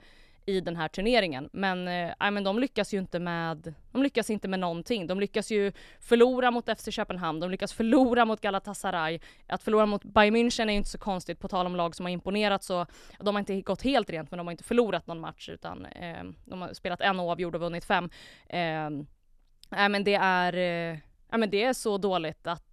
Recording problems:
none

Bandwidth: 13.5 kHz